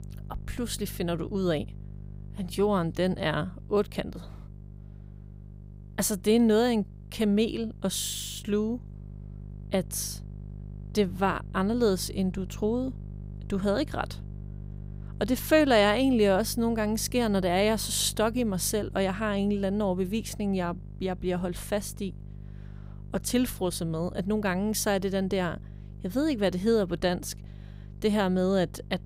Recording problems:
electrical hum; faint; throughout; 50 Hz, 25 dB below the speech

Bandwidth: 15.5 kHz